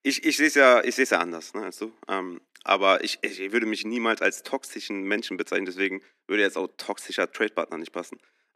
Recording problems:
thin; somewhat; fading below 250 Hz

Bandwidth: 14 kHz